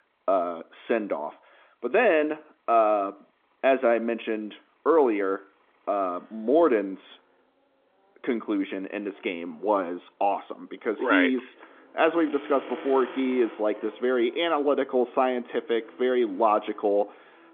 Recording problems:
phone-call audio; nothing above 3.5 kHz
traffic noise; faint; throughout; 20 dB below the speech

